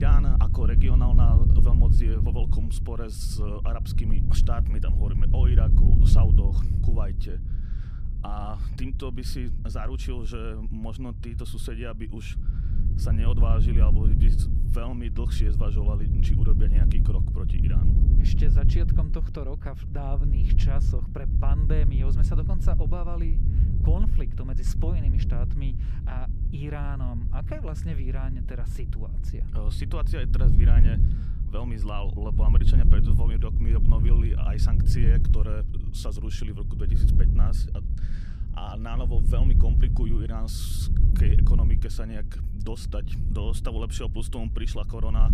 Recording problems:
low rumble; loud; throughout; 2 dB below the speech
abrupt cut into speech; at the start

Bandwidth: 14.5 kHz